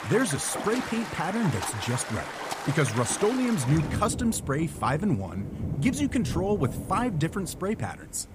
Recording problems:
rain or running water; loud; throughout; 7 dB below the speech

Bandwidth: 15 kHz